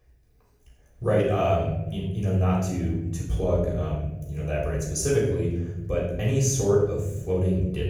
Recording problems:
off-mic speech; far
room echo; noticeable; dies away in 1.2 s

